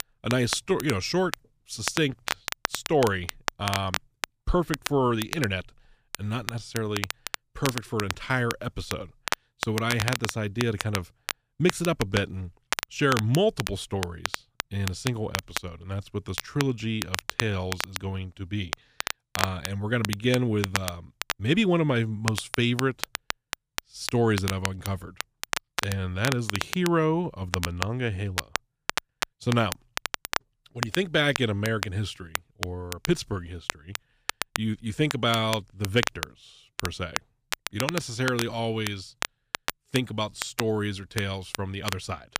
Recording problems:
crackle, like an old record; loud; 6 dB below the speech

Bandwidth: 15 kHz